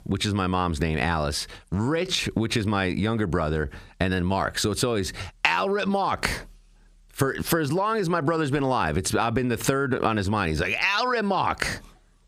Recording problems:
squashed, flat; heavily

